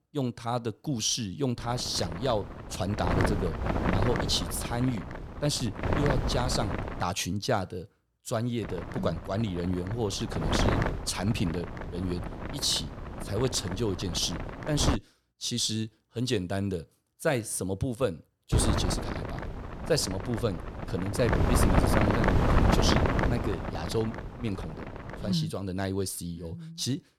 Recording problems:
wind noise on the microphone; heavy; from 1.5 to 7 s, from 8.5 to 15 s and from 19 to 25 s; 1 dB below the speech

